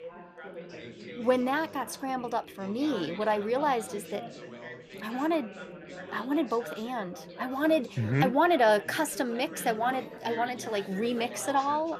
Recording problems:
background chatter; noticeable; throughout; 4 voices, 15 dB below the speech

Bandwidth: 14.5 kHz